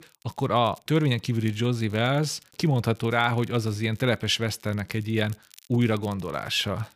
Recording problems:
crackle, like an old record; faint; 30 dB below the speech

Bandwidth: 15 kHz